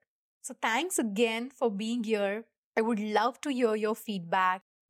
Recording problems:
none

